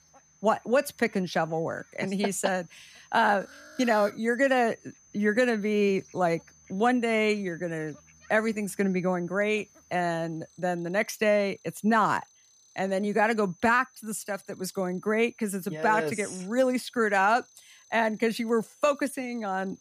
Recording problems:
high-pitched whine; faint; throughout; 6 kHz, 30 dB below the speech
animal sounds; faint; throughout; 30 dB below the speech

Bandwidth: 15 kHz